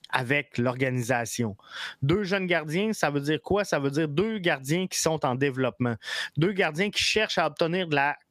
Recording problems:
squashed, flat; somewhat

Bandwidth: 15 kHz